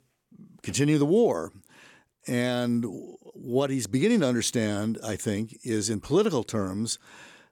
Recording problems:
none

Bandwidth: 18 kHz